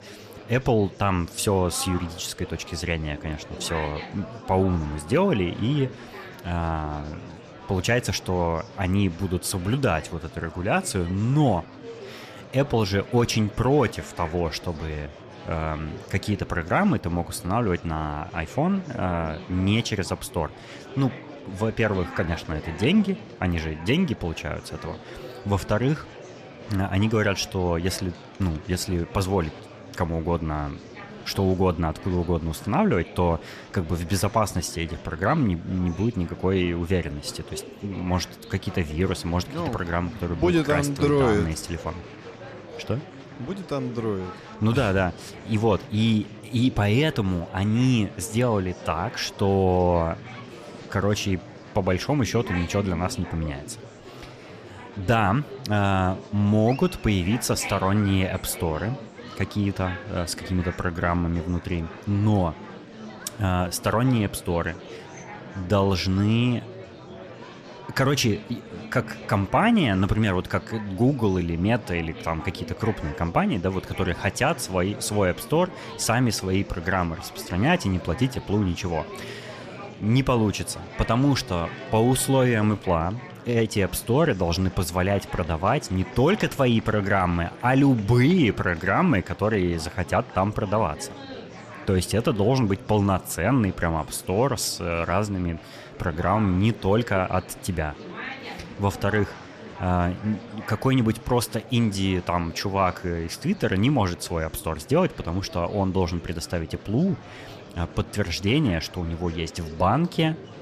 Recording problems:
murmuring crowd; noticeable; throughout; 15 dB below the speech

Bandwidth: 14.5 kHz